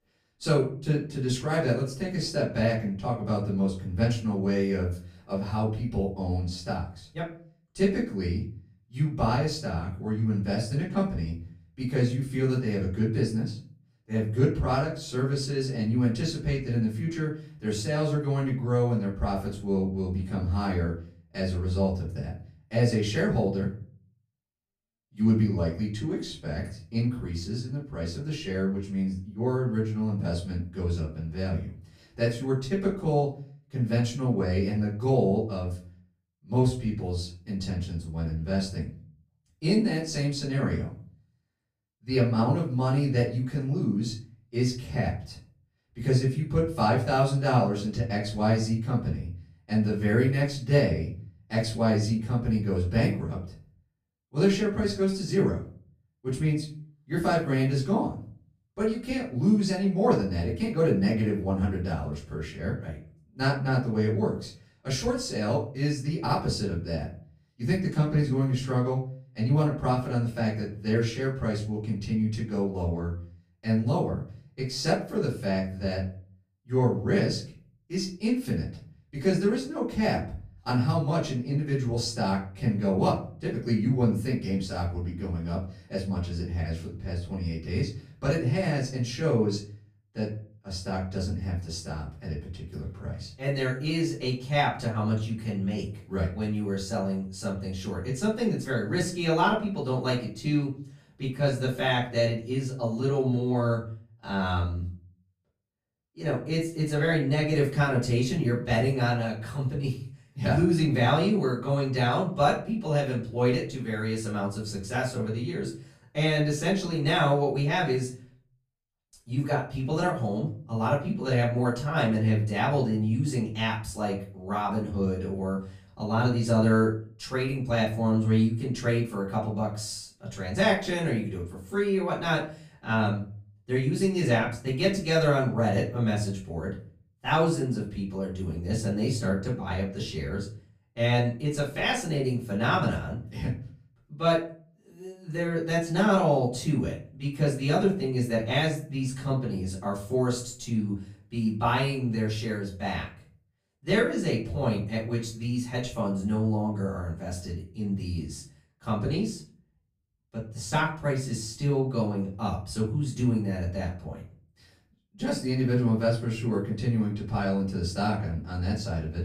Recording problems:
off-mic speech; far
room echo; slight; dies away in 0.4 s

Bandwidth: 15 kHz